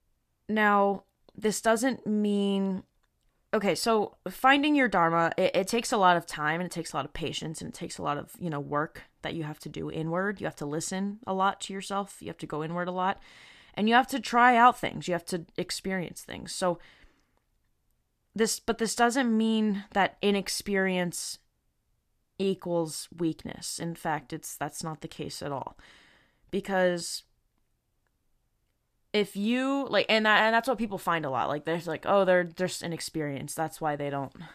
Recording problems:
none

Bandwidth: 14.5 kHz